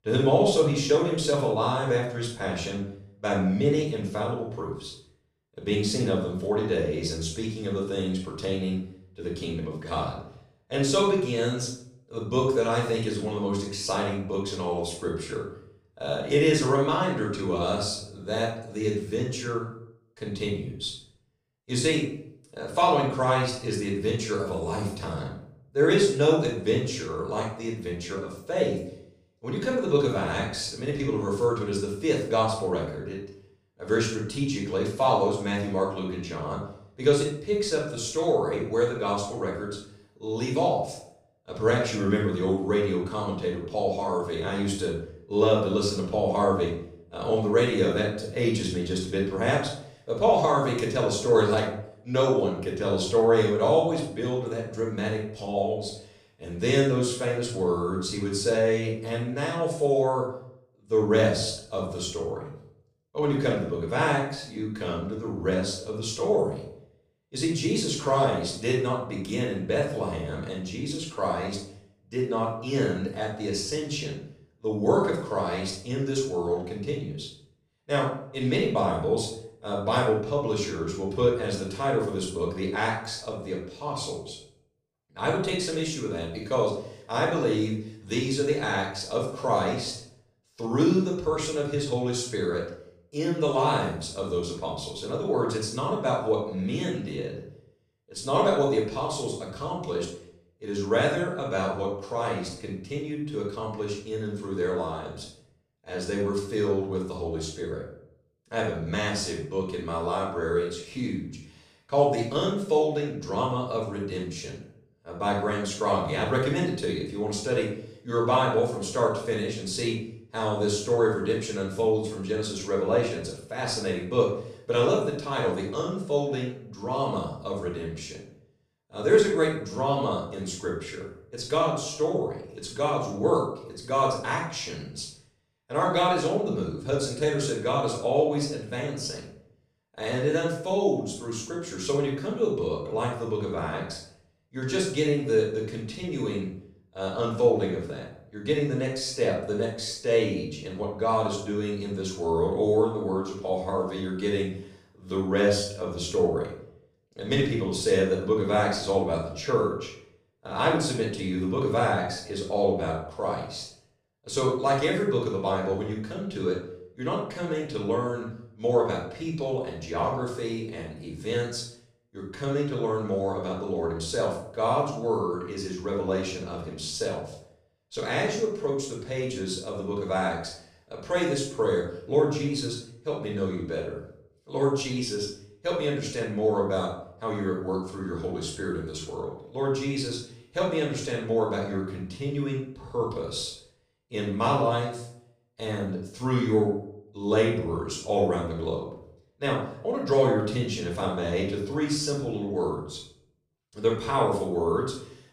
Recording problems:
off-mic speech; far
room echo; noticeable; dies away in 0.5 s

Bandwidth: 15 kHz